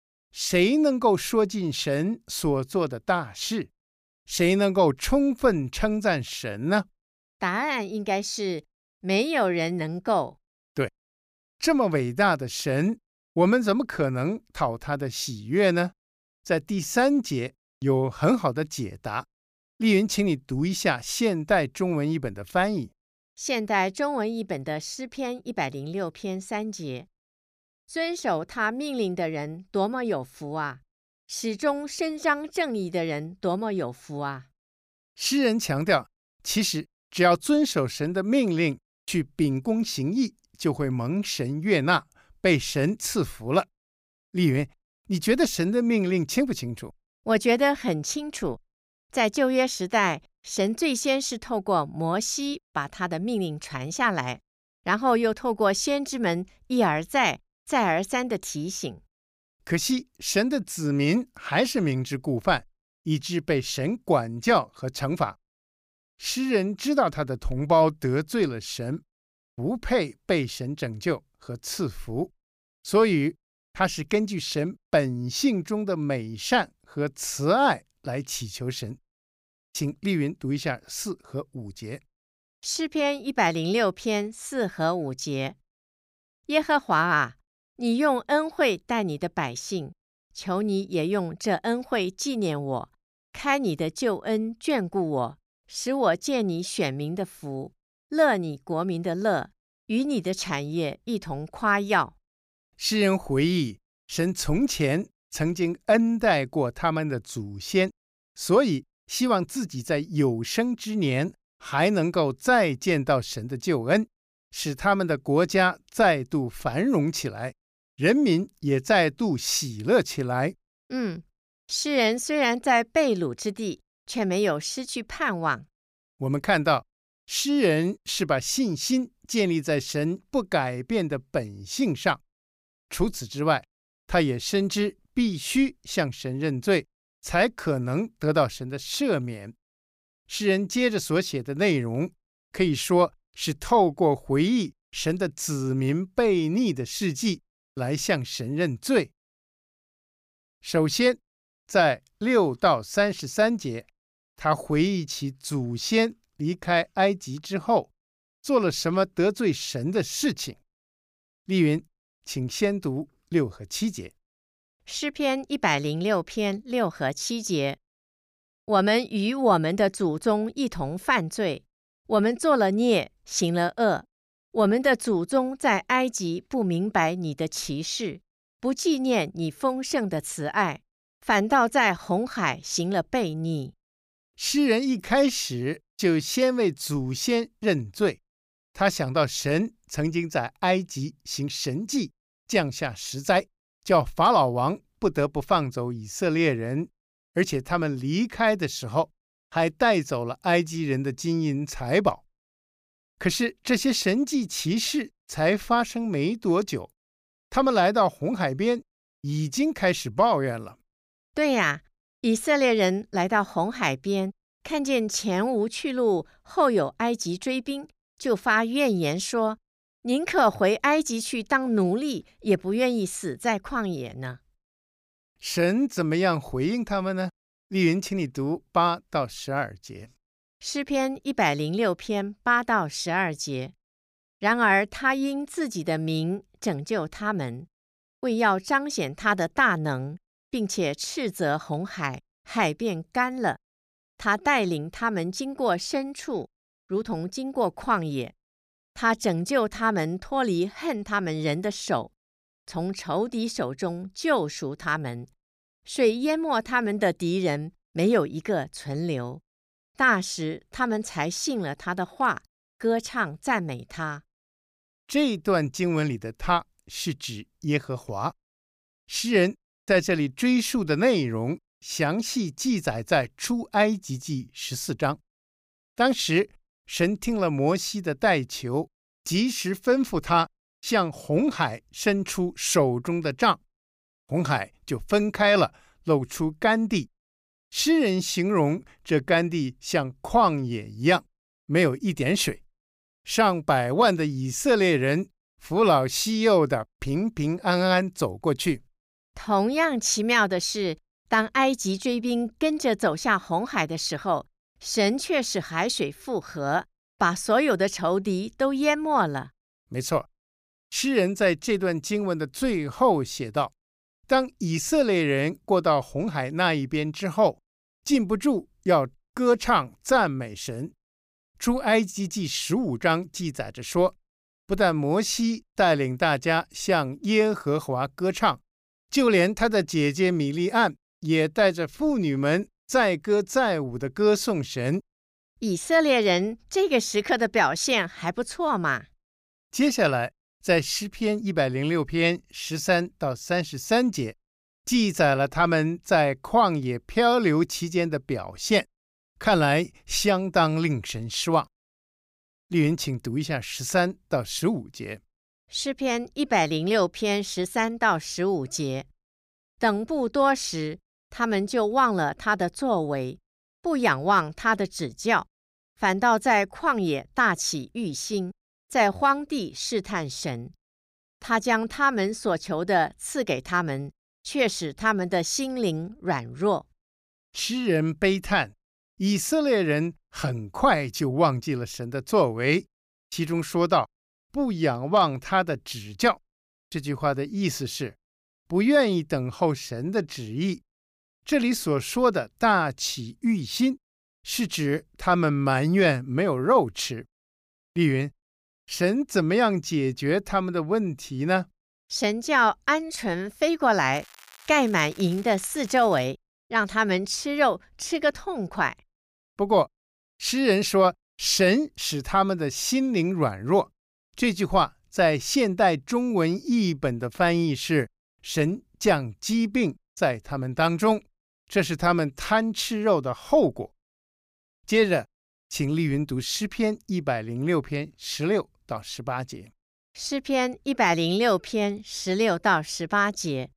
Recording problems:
crackling; faint; from 6:44 to 6:46; 20 dB below the speech

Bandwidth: 15 kHz